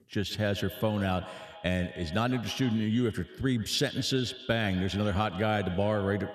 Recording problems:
echo of what is said; noticeable; throughout; 130 ms later, 15 dB below the speech

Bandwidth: 14 kHz